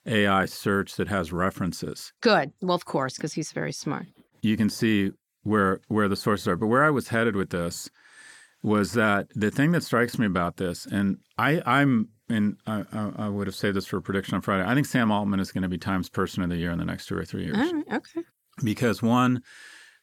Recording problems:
none

